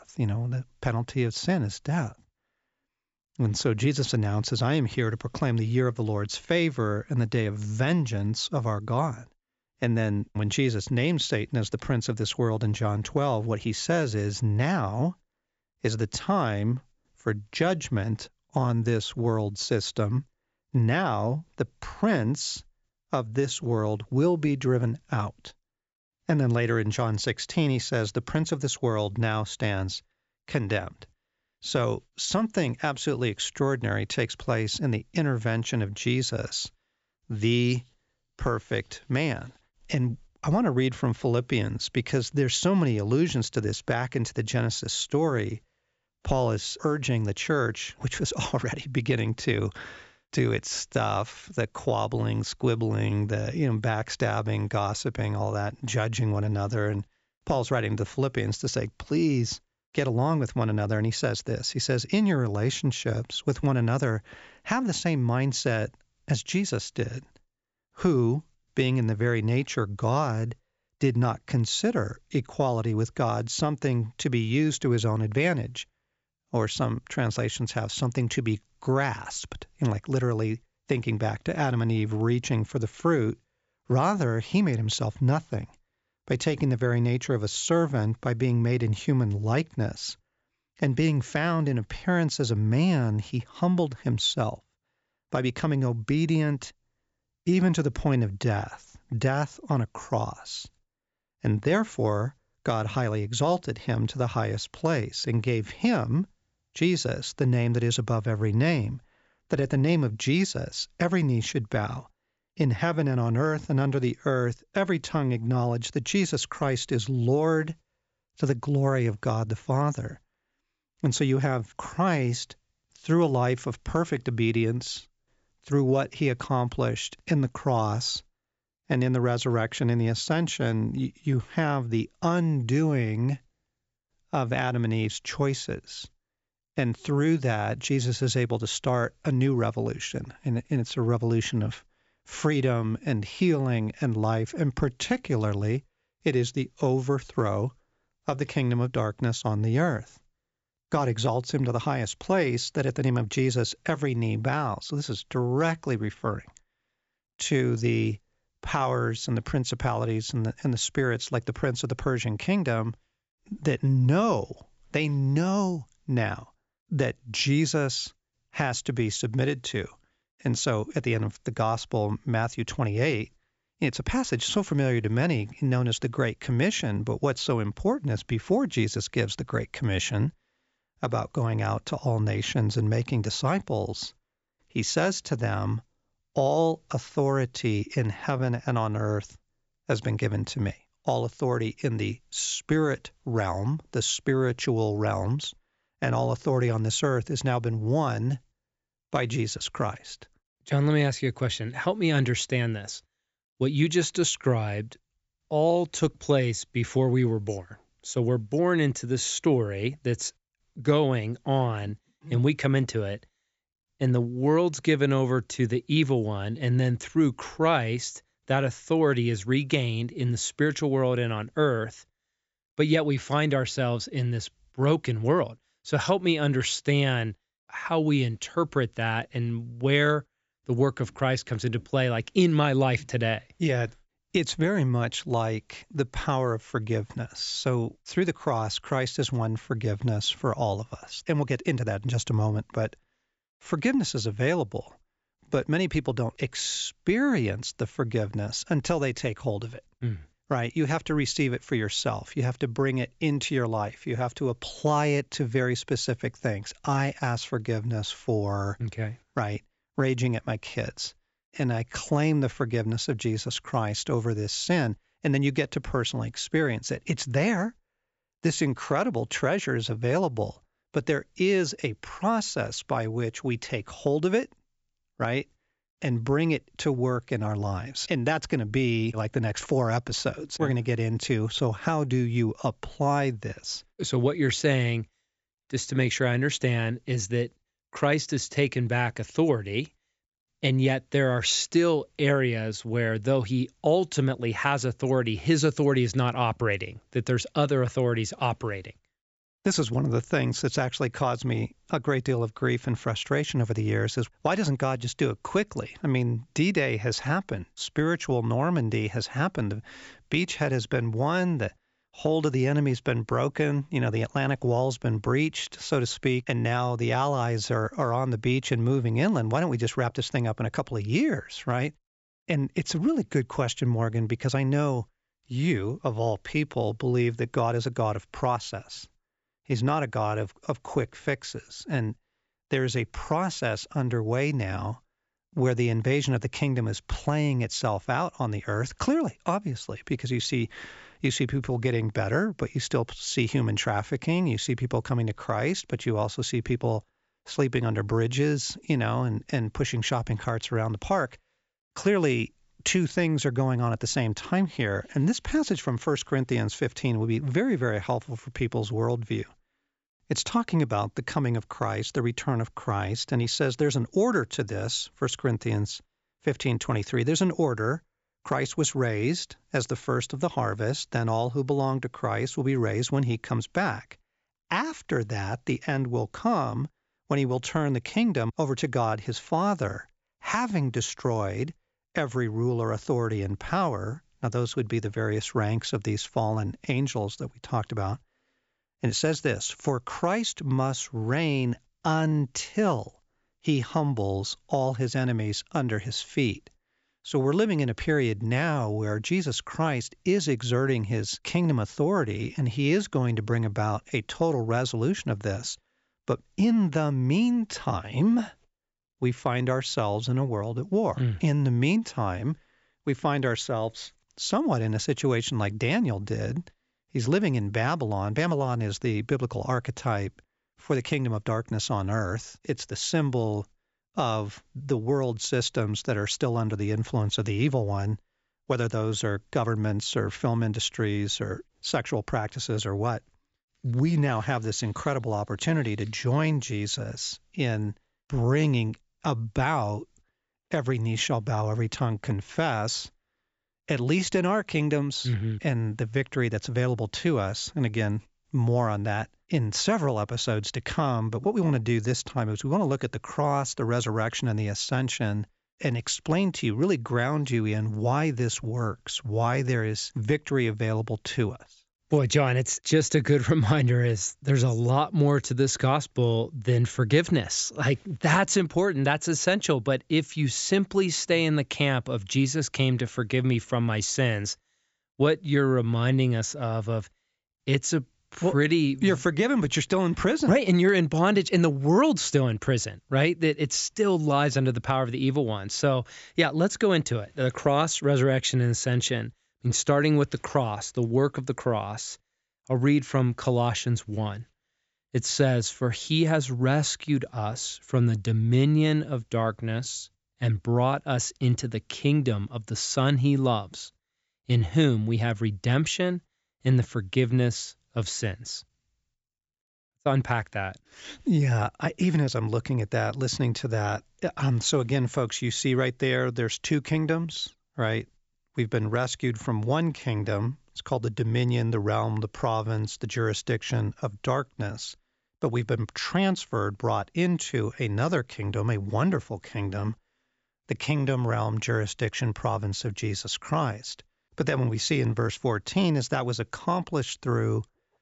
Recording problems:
high frequencies cut off; noticeable; nothing above 8 kHz

